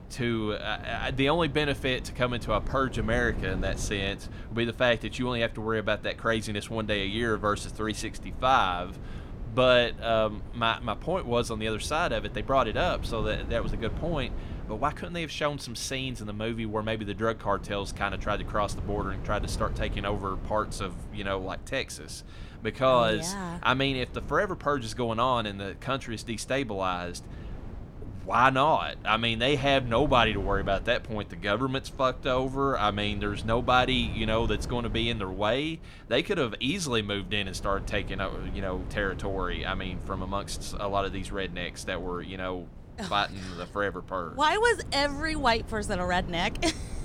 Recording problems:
wind noise on the microphone; occasional gusts; 20 dB below the speech

